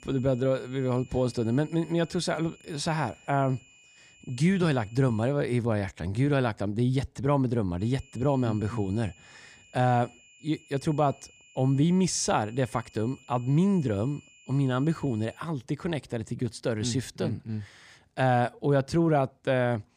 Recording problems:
high-pitched whine; faint; until 5.5 s and from 8 to 15 s; 2.5 kHz, 25 dB below the speech

